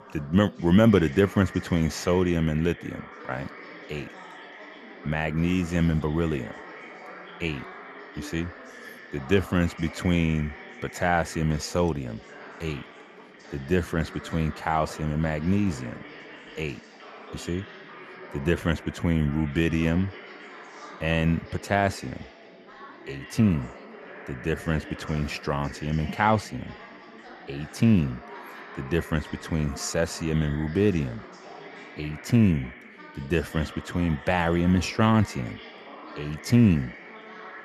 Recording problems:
background chatter; noticeable; throughout; 4 voices, 15 dB below the speech

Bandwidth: 13.5 kHz